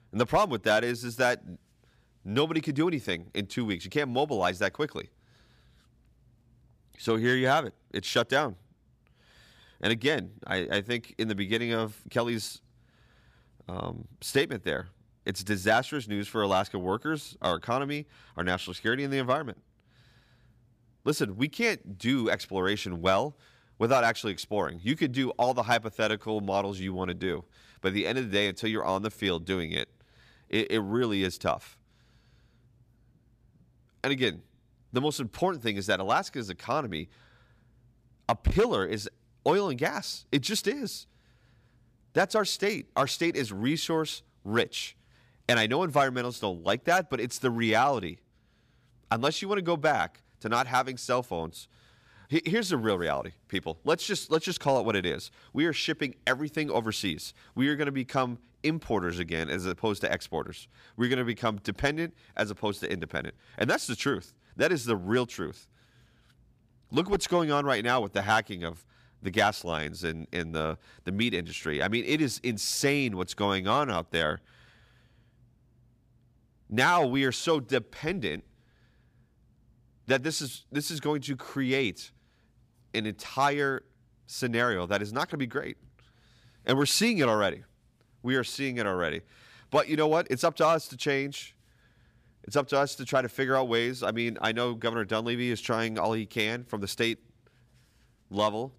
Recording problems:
none

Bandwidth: 15 kHz